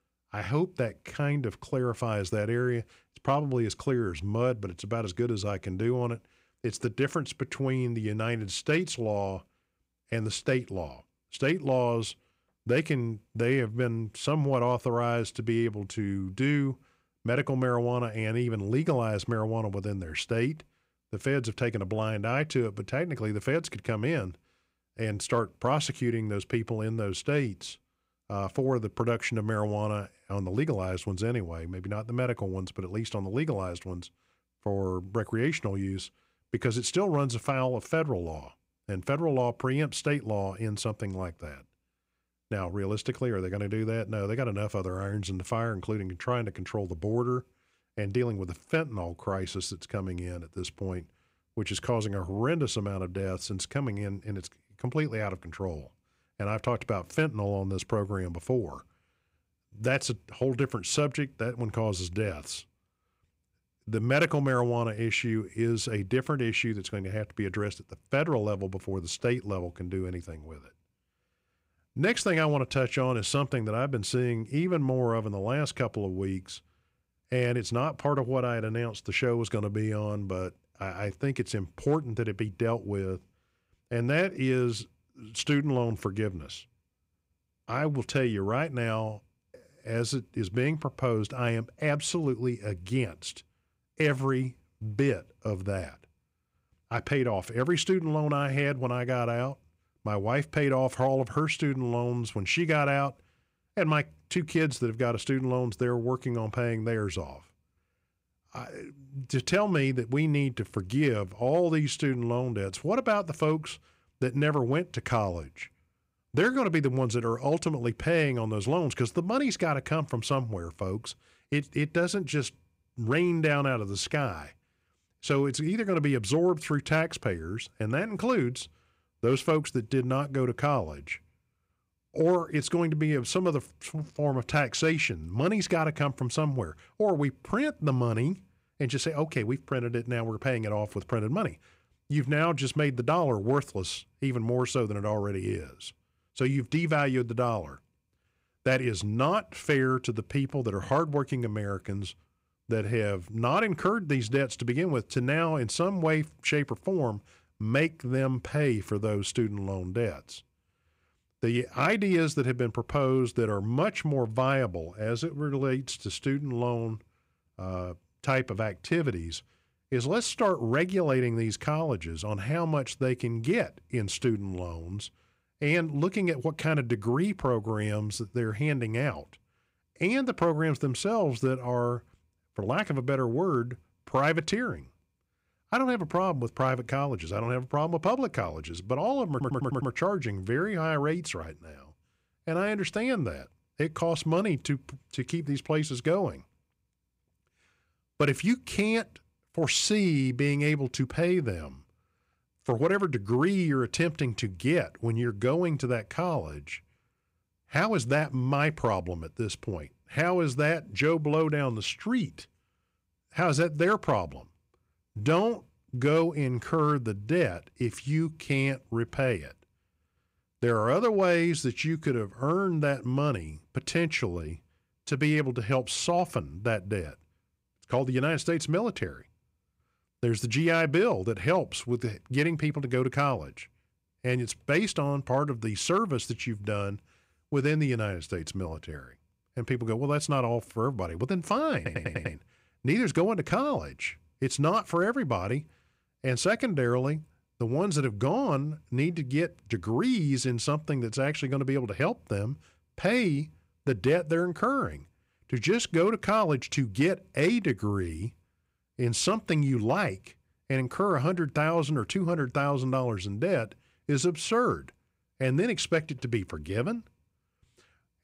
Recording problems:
audio stuttering; at 3:09 and at 4:02

